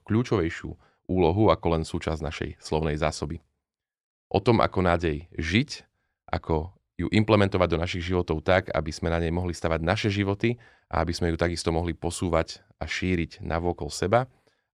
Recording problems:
none

